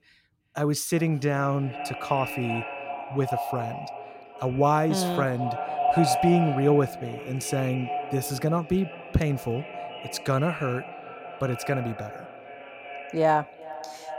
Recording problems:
echo of what is said; strong; throughout; 380 ms later, 7 dB below the speech

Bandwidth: 16.5 kHz